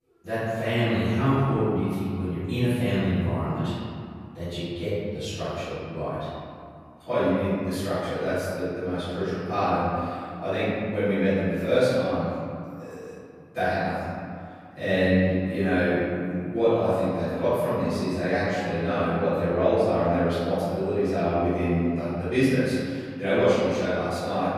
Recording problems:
room echo; strong; dies away in 2.3 s
off-mic speech; far

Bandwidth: 14.5 kHz